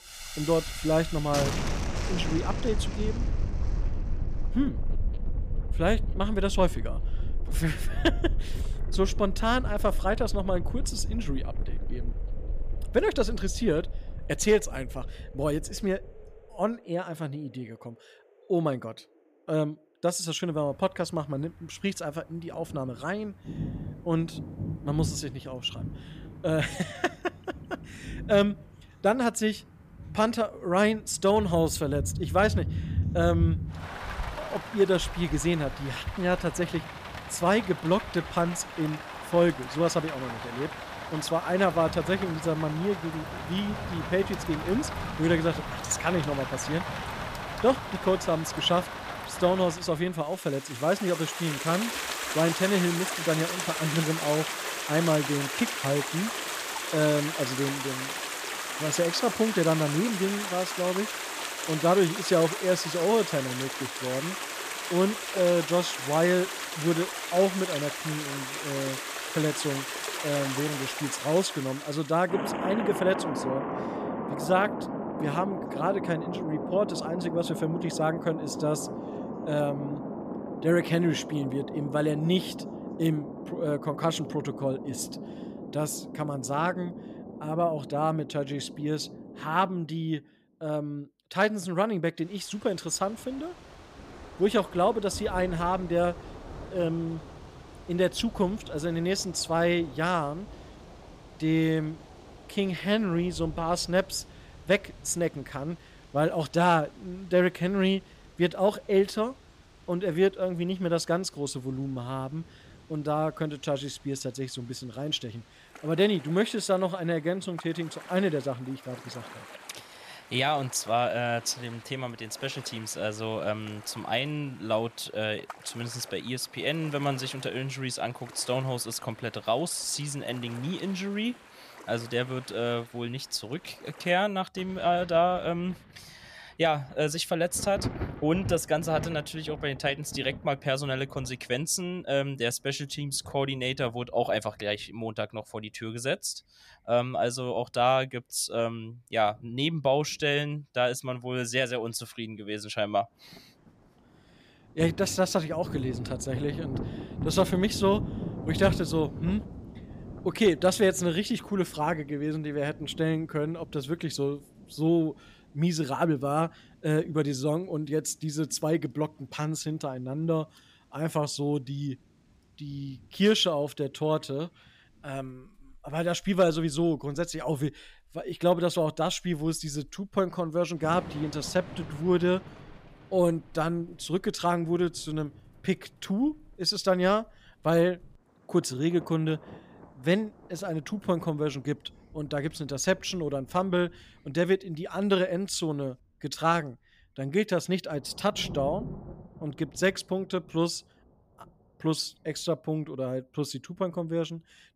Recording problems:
rain or running water; loud; throughout; 7 dB below the speech

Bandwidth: 15 kHz